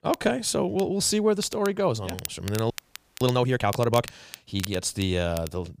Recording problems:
crackle, like an old record; noticeable; 15 dB below the speech
audio freezing; at 2.5 s for 0.5 s

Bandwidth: 15 kHz